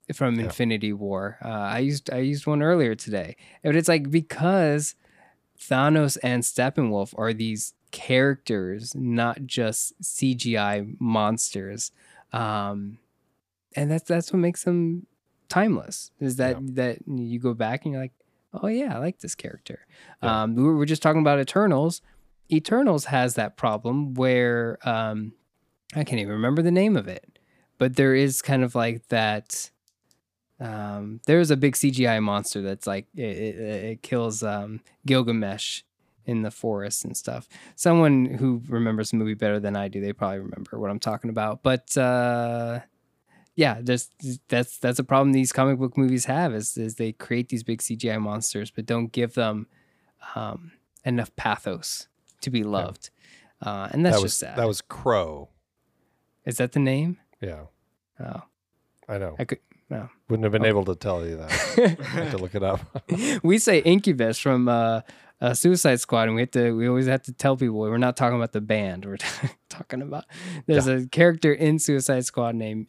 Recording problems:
none

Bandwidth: 15 kHz